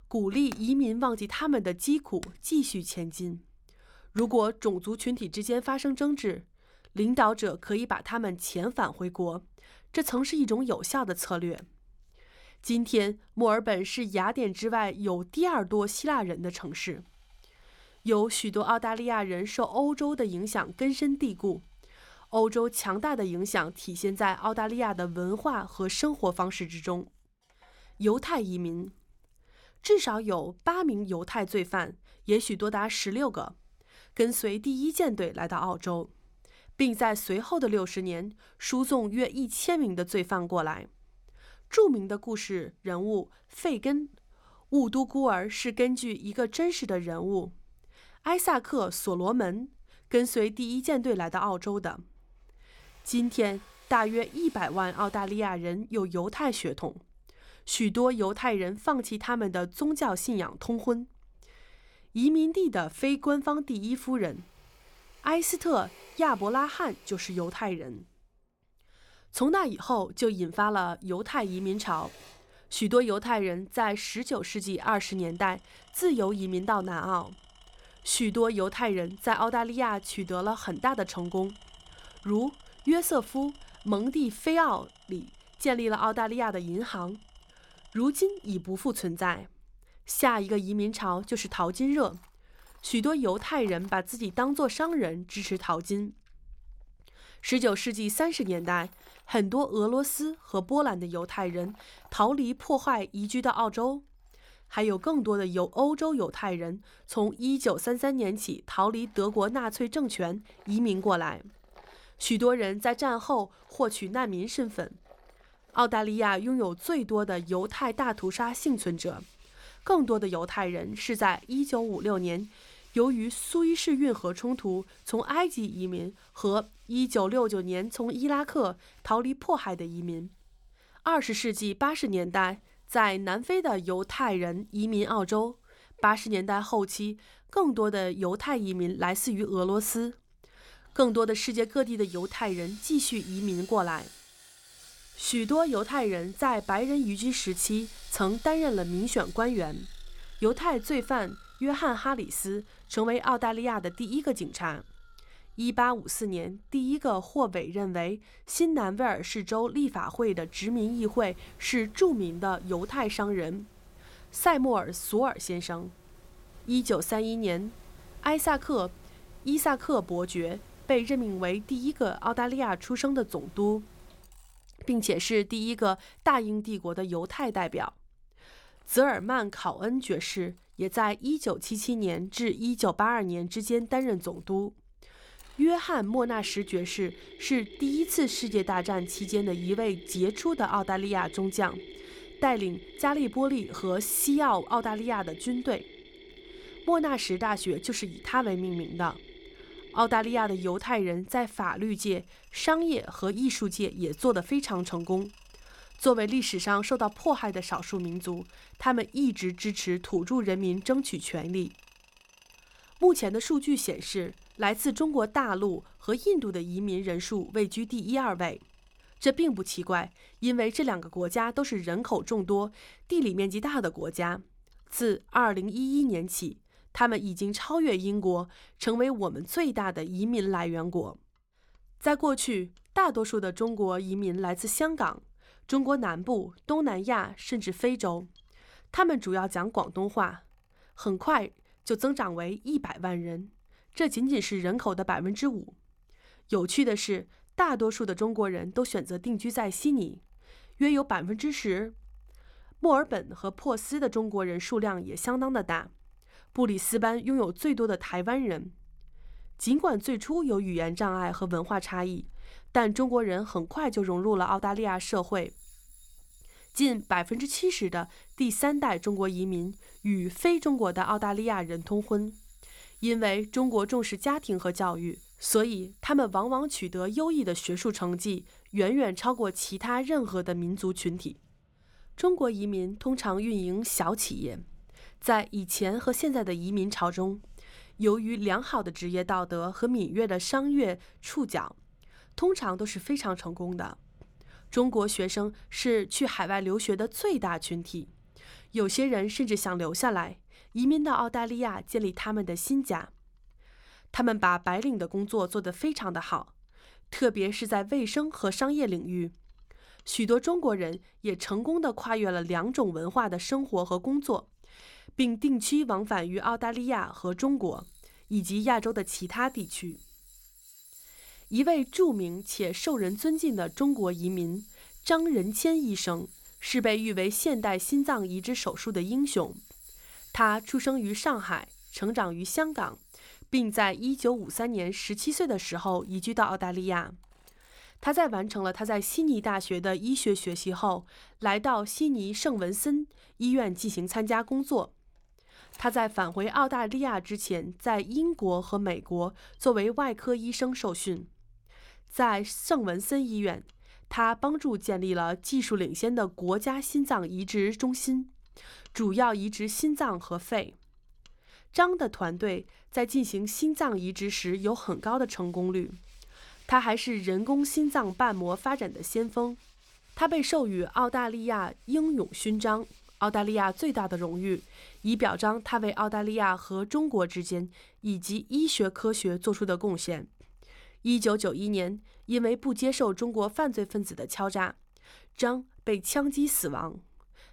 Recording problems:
machinery noise; faint; throughout; 25 dB below the speech

